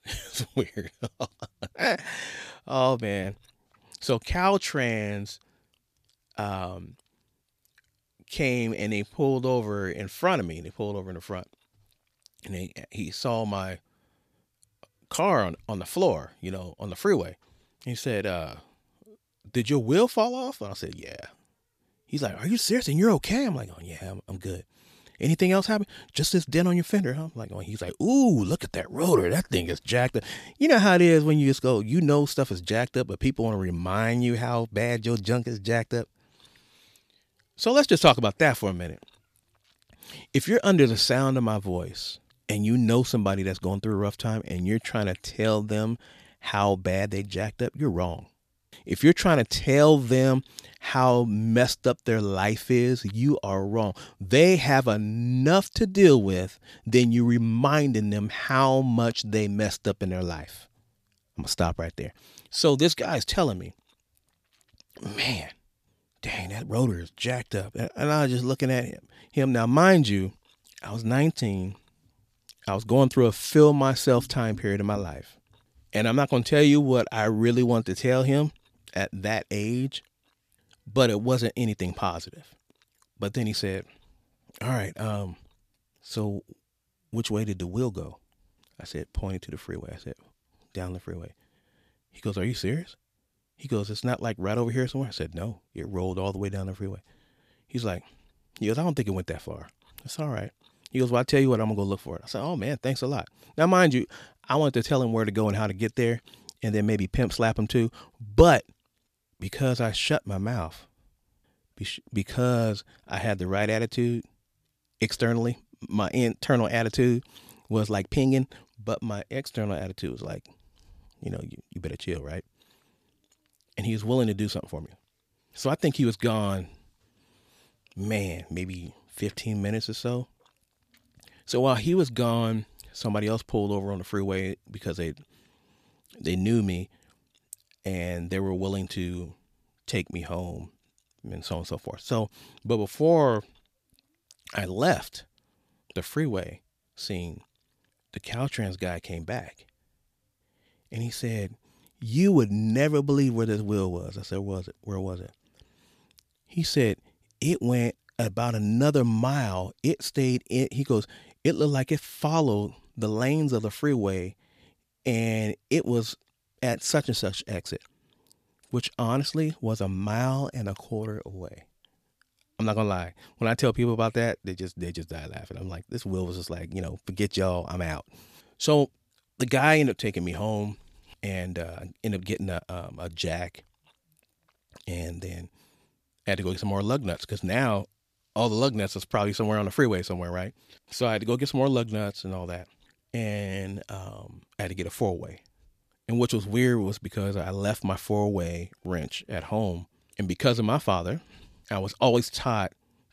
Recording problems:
none

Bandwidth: 14.5 kHz